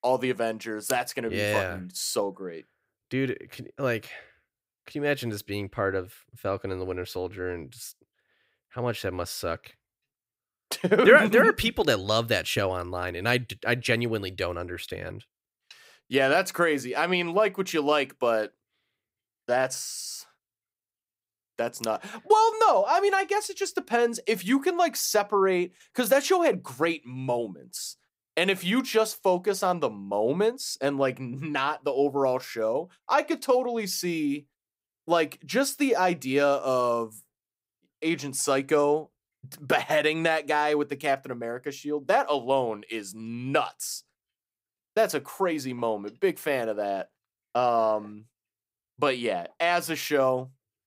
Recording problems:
none

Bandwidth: 15.5 kHz